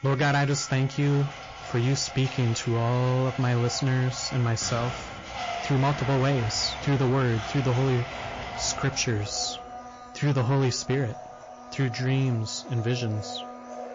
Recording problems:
distortion; slight; 11% of the sound clipped
garbled, watery; slightly
household noises; noticeable; throughout; 10 dB below the speech

